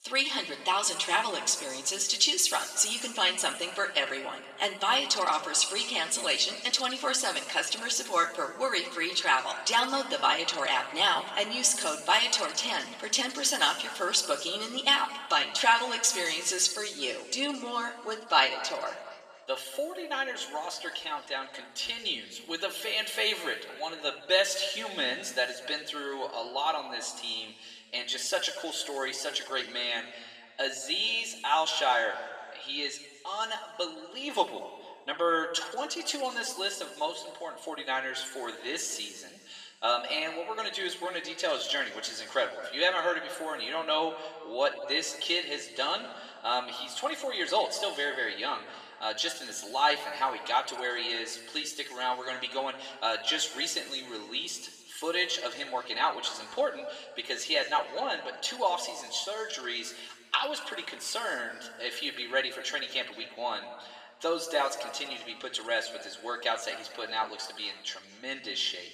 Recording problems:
thin; very; fading below 800 Hz
room echo; noticeable; dies away in 1.6 s
off-mic speech; somewhat distant

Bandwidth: 14.5 kHz